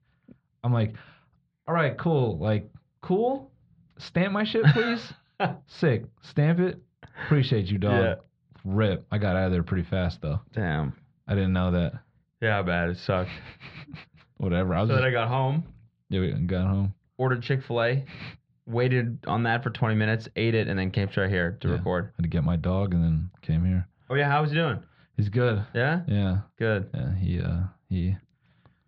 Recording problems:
muffled; slightly; fading above 4 kHz

